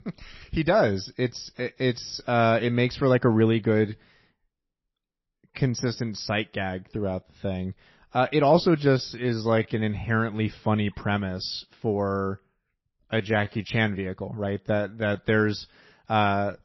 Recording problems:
garbled, watery; slightly; nothing above 5.5 kHz
uneven, jittery; strongly; from 5.5 to 15 s

